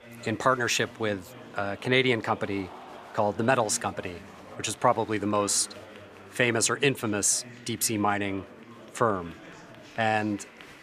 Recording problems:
murmuring crowd; noticeable; throughout; 20 dB below the speech

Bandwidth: 14.5 kHz